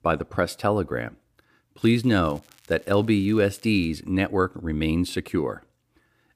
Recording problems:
crackling; faint; from 2 to 4 s; 30 dB below the speech

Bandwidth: 15 kHz